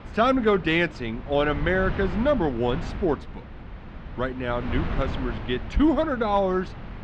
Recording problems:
muffled; slightly; fading above 3.5 kHz
wind noise on the microphone; occasional gusts; 15 dB below the speech

